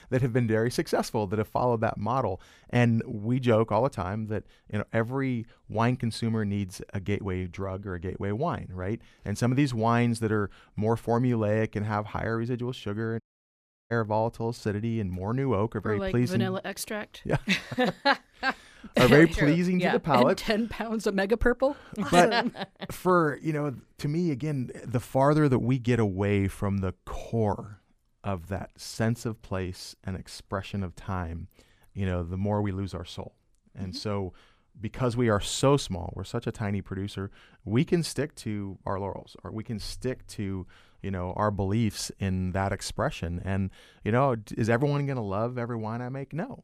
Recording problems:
audio cutting out; at 13 s for 0.5 s

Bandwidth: 14.5 kHz